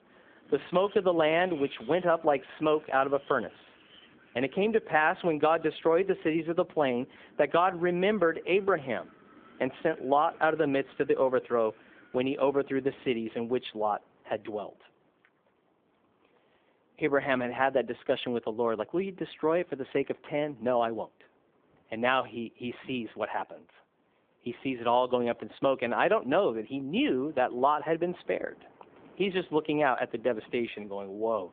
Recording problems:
phone-call audio
wind in the background; faint; throughout; 25 dB below the speech

